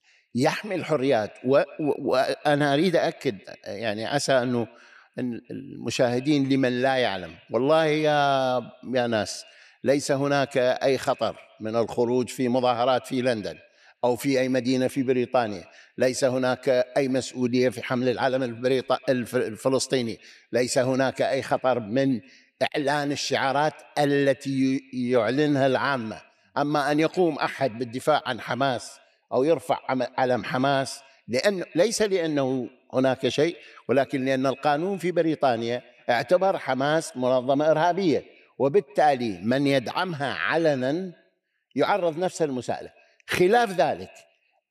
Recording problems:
echo of what is said; faint; throughout; 130 ms later, 25 dB below the speech

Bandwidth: 14 kHz